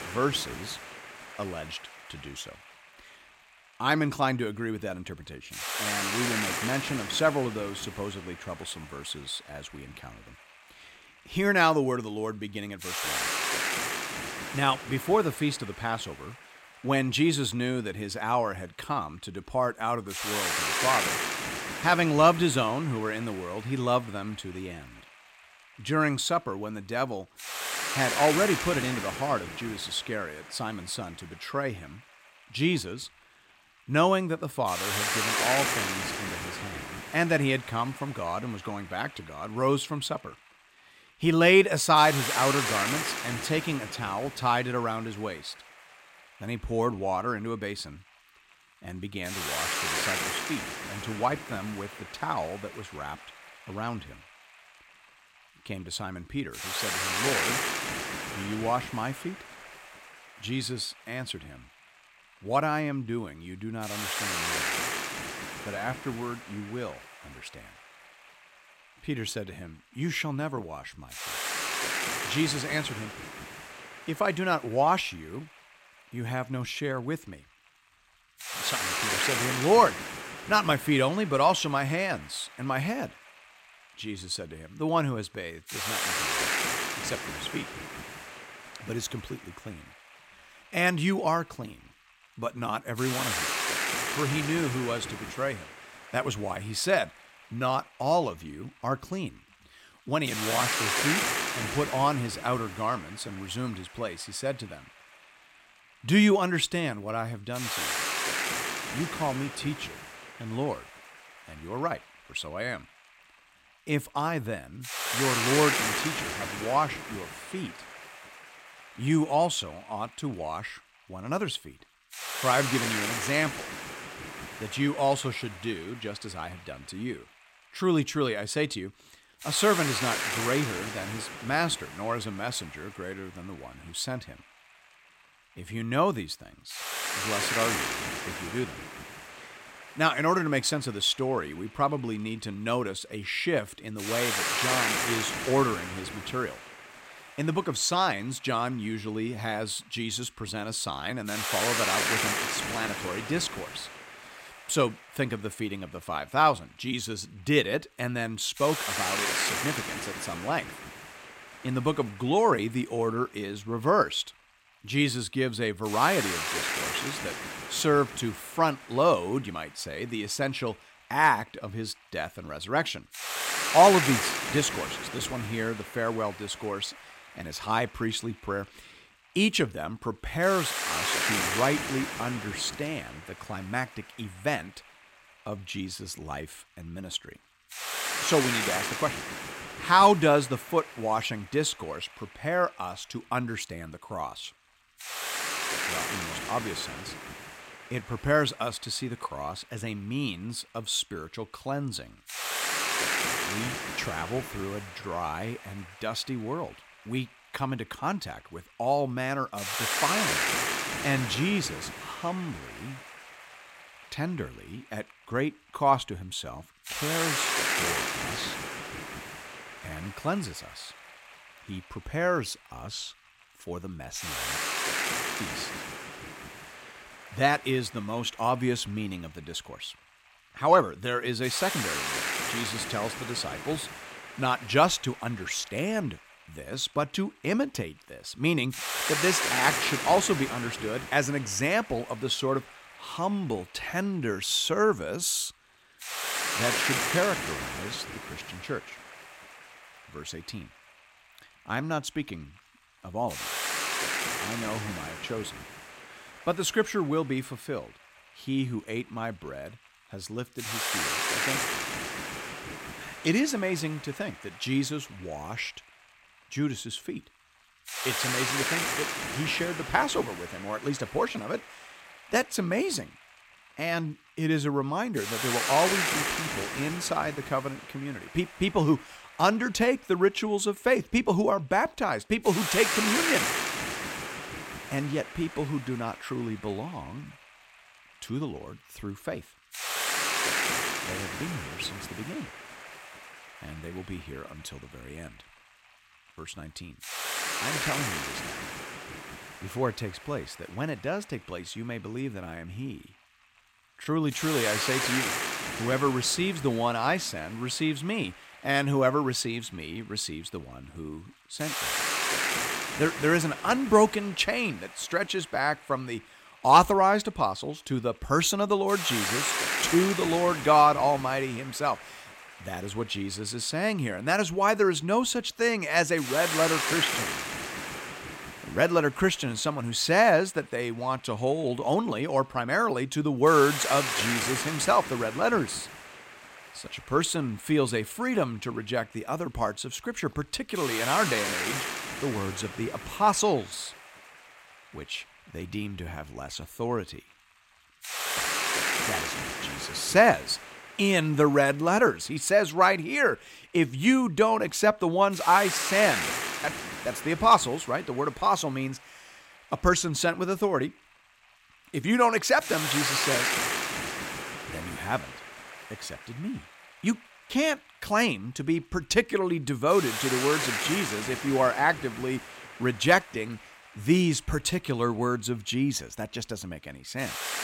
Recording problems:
hiss; loud; throughout; 3 dB below the speech

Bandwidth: 16 kHz